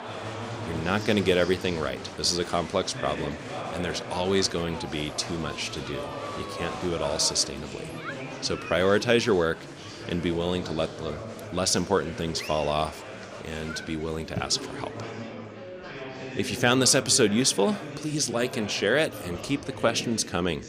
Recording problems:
murmuring crowd; noticeable; throughout; 10 dB below the speech

